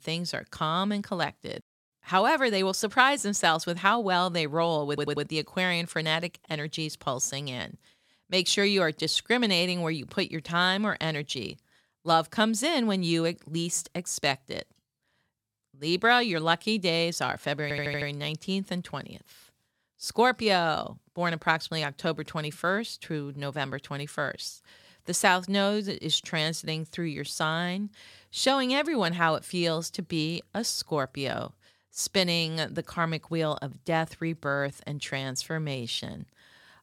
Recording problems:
audio stuttering; at 5 s and at 18 s

